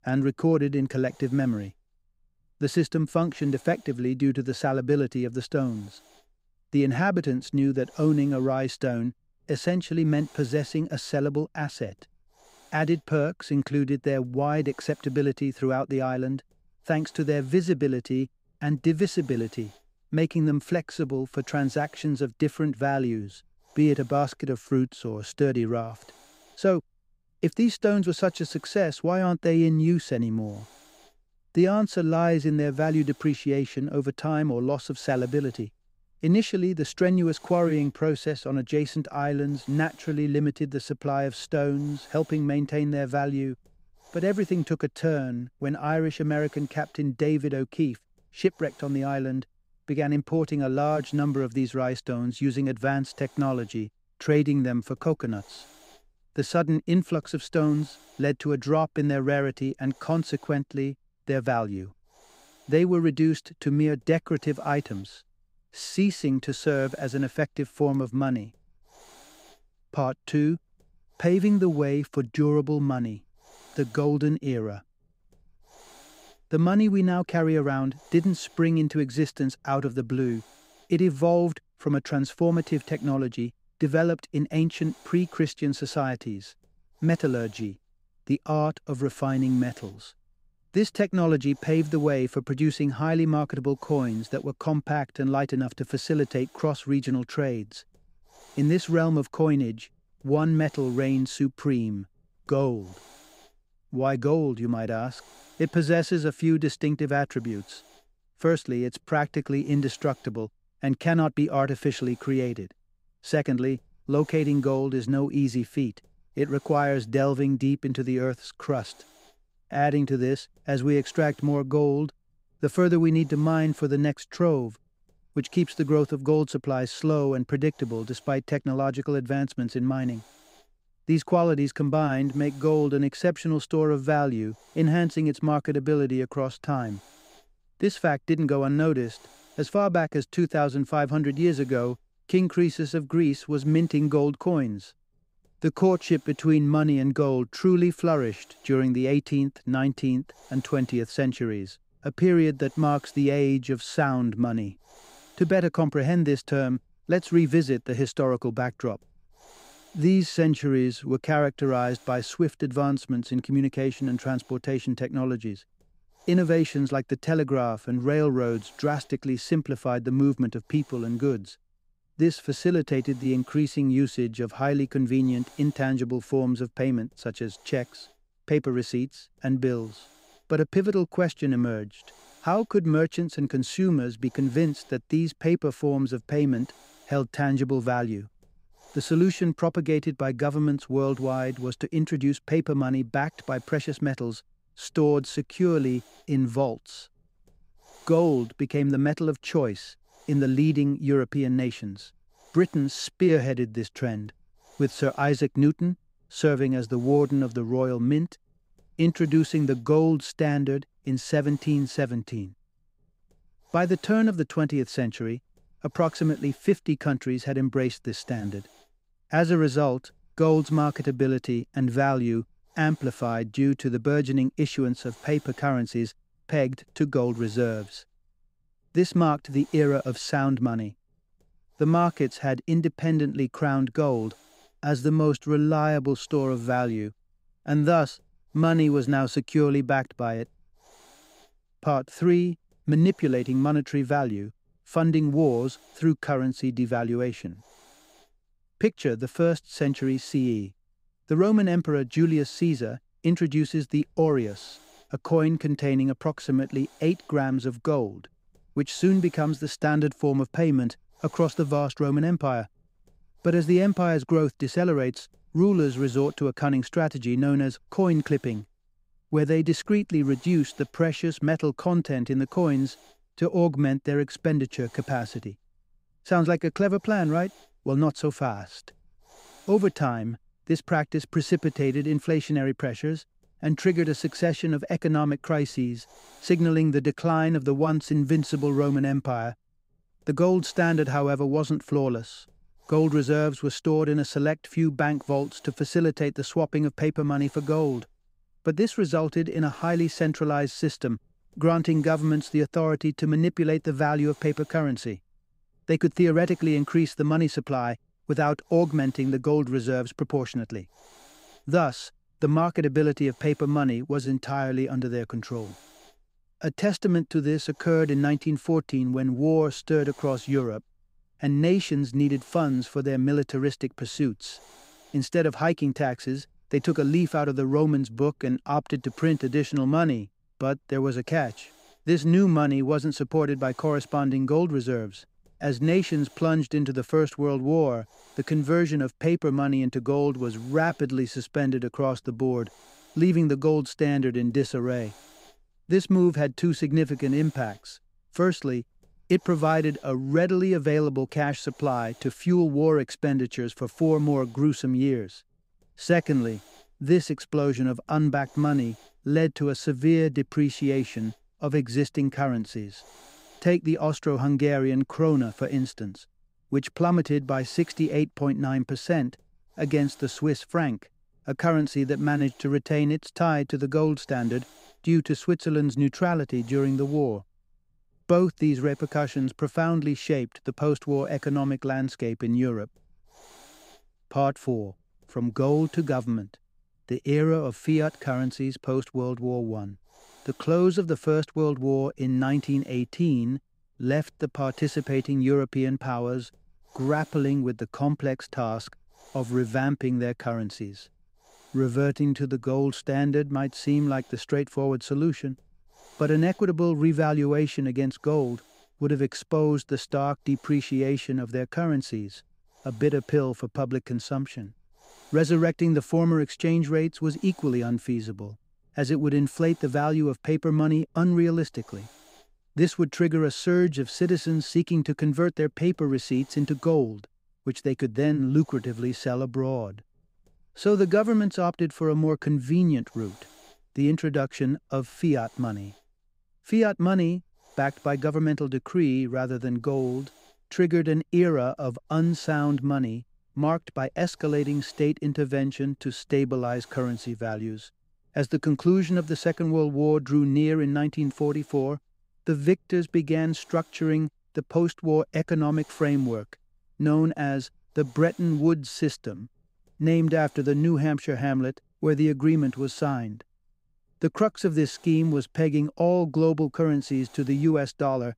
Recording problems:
hiss; faint; throughout; 30 dB below the speech

